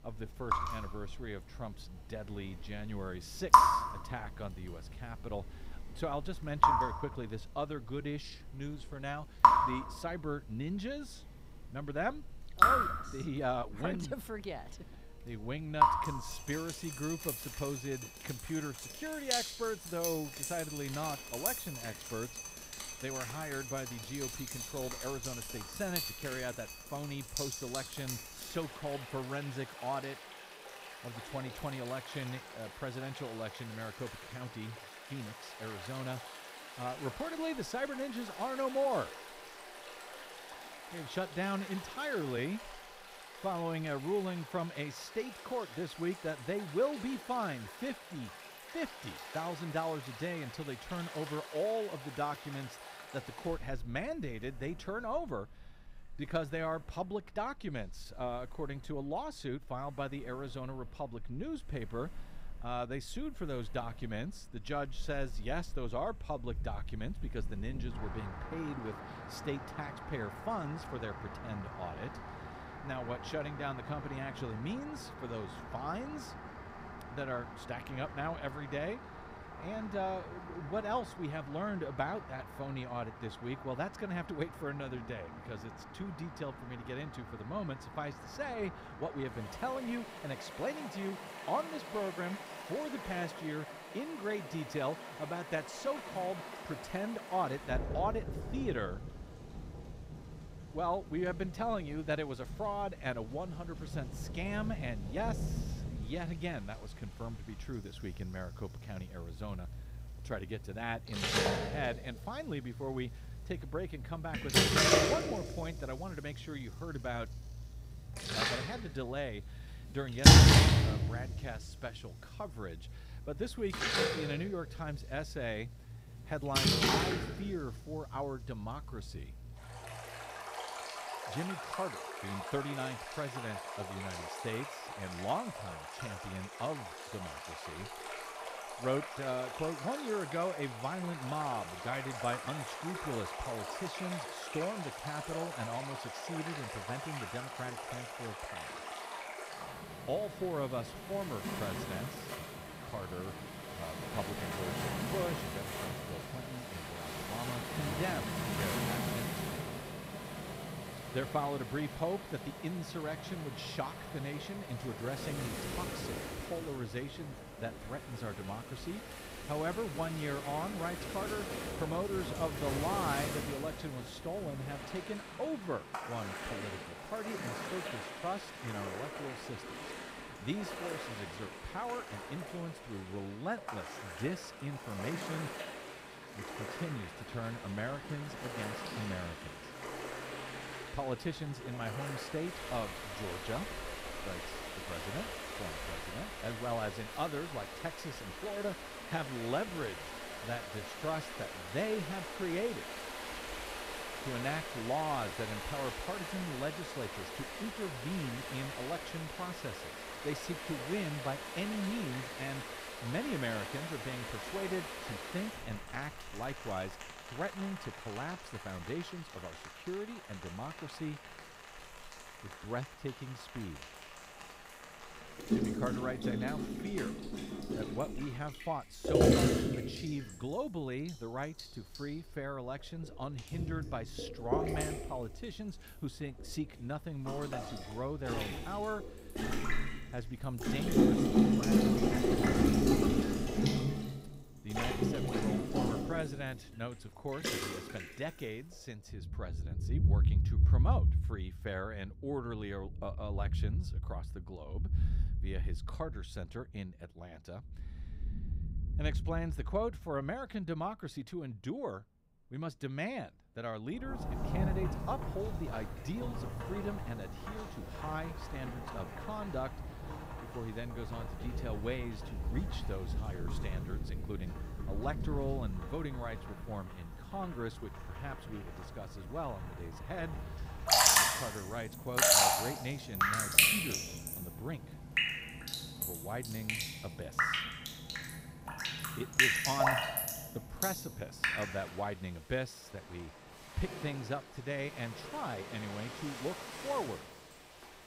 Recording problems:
rain or running water; very loud; throughout; 4 dB above the speech

